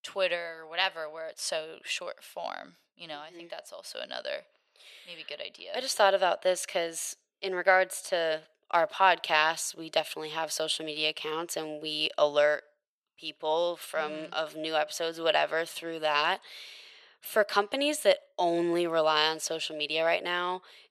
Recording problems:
thin; very; fading below 600 Hz

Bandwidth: 13.5 kHz